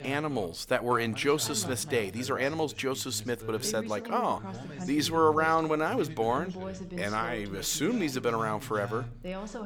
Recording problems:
background chatter; noticeable; throughout; 2 voices, 10 dB below the speech

